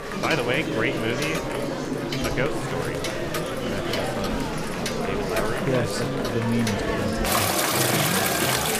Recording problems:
household noises; very loud; throughout; 1 dB above the speech
murmuring crowd; very loud; throughout; 1 dB above the speech

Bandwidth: 15 kHz